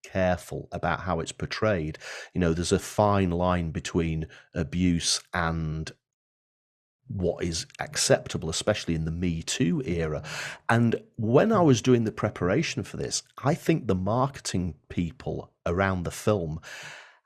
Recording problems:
none

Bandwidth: 14 kHz